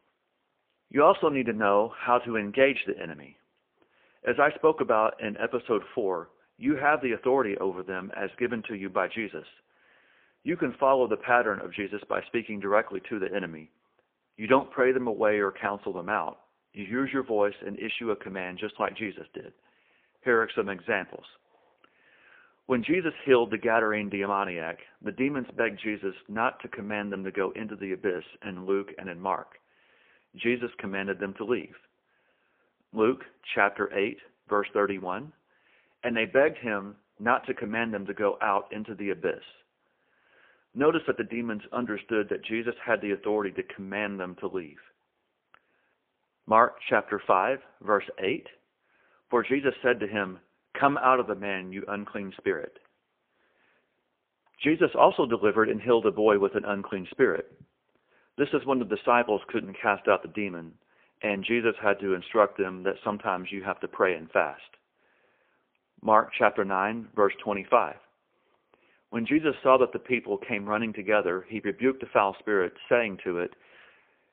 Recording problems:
phone-call audio; poor line

